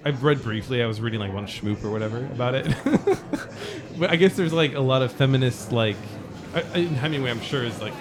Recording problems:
murmuring crowd; noticeable; throughout; 15 dB below the speech

